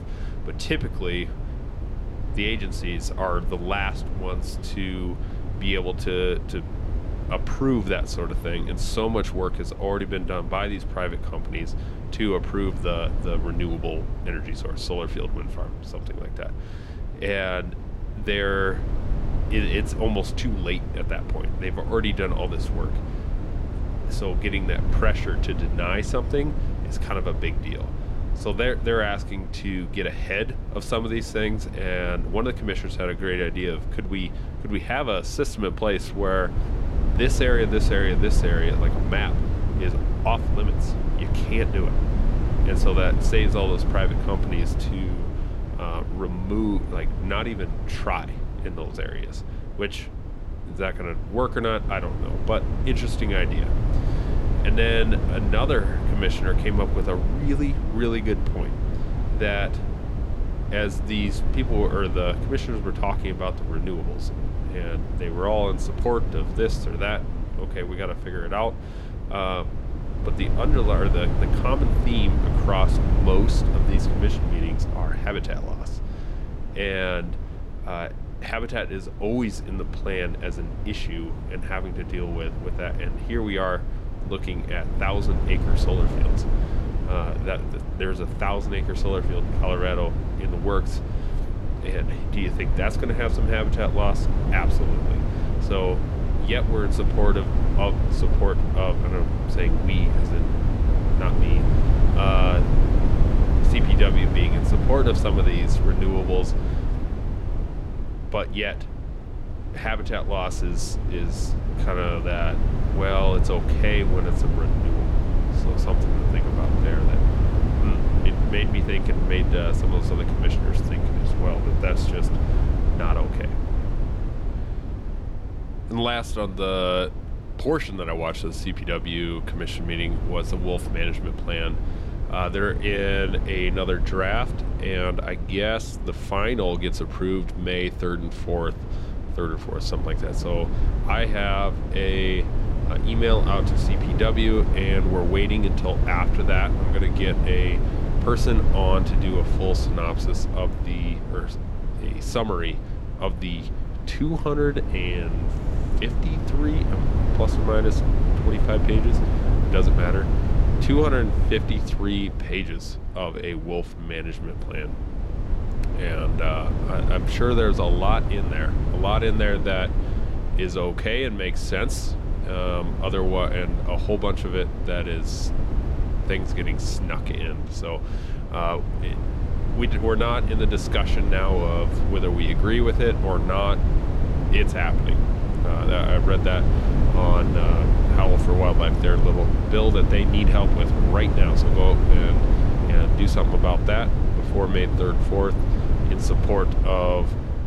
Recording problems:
low rumble; loud; throughout; 8 dB below the speech

